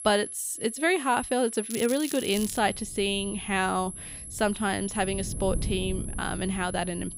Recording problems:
high-pitched whine; loud; throughout; 11 kHz, 9 dB below the speech
wind noise on the microphone; occasional gusts; from 2.5 s on; 25 dB below the speech
crackling; noticeable; at 1.5 s; 10 dB below the speech

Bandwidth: 15.5 kHz